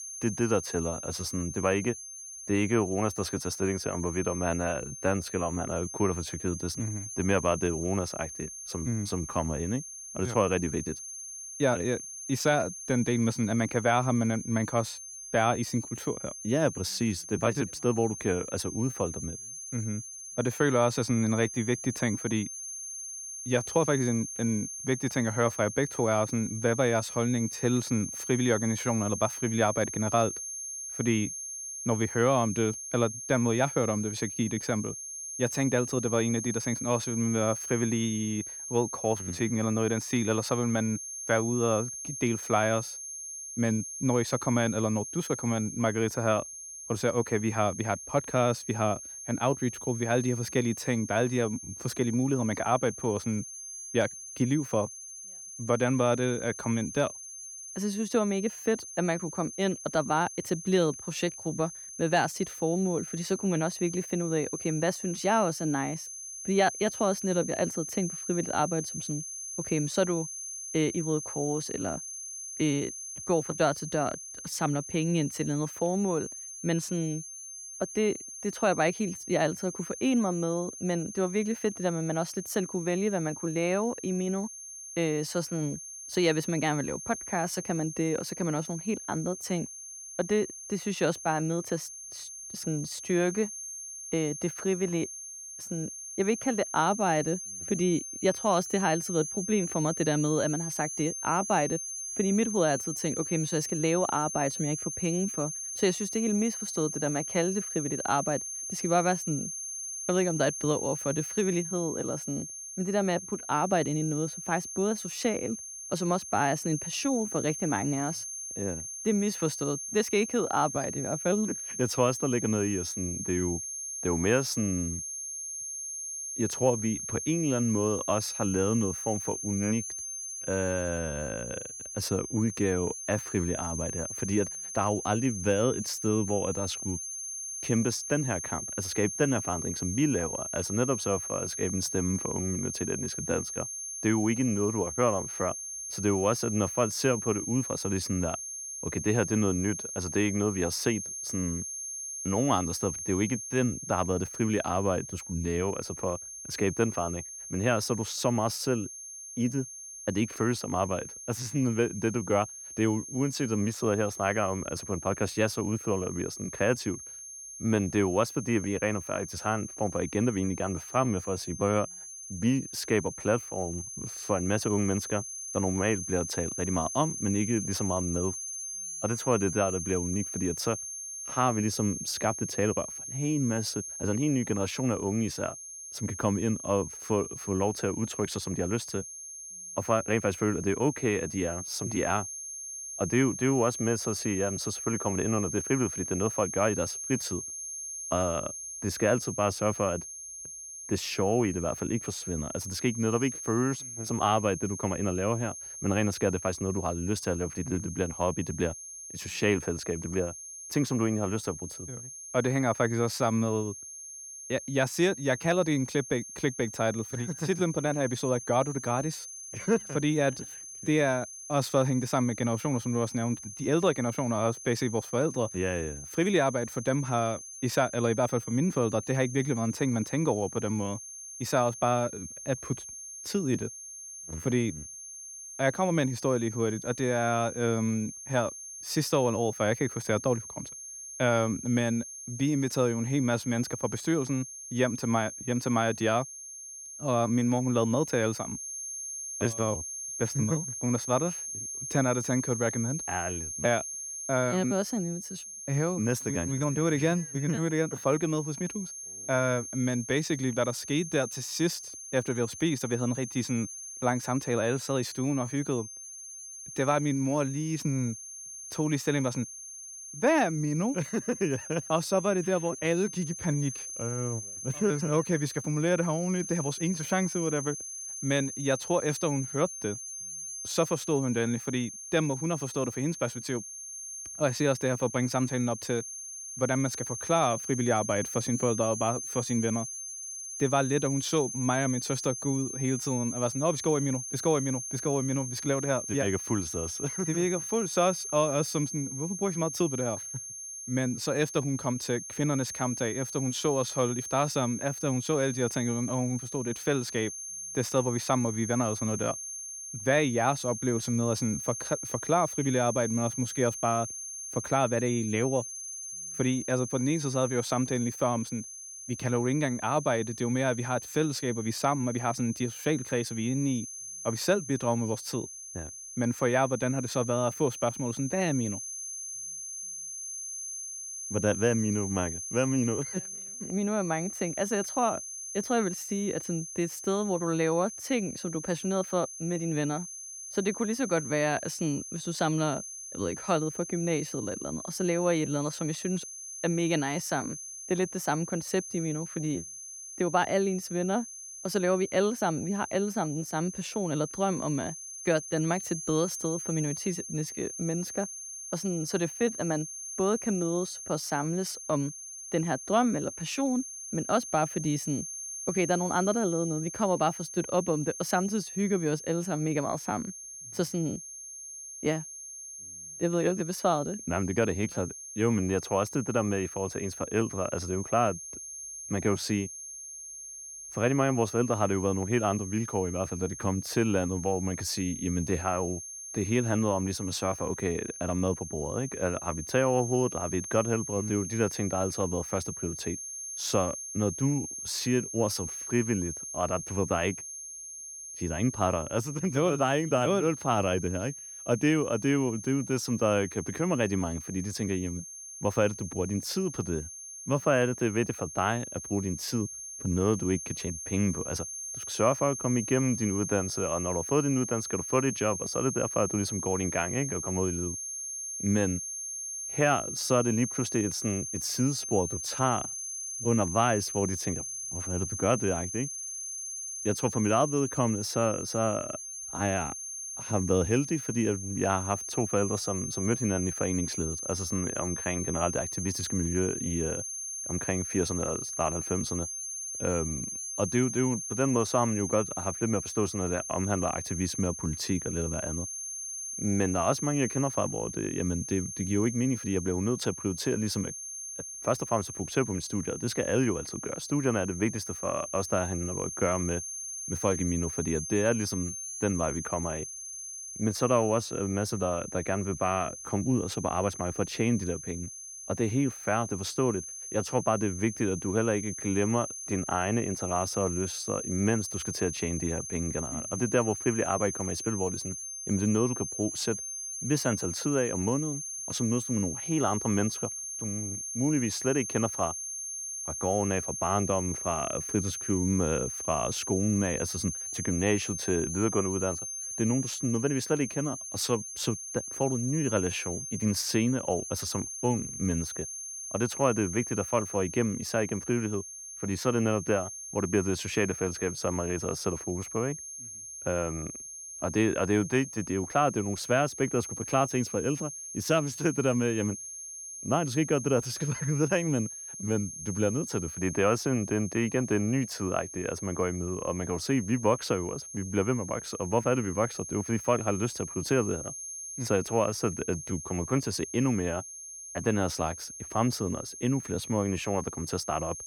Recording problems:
high-pitched whine; loud; throughout; 6.5 kHz, 7 dB below the speech

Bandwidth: 18.5 kHz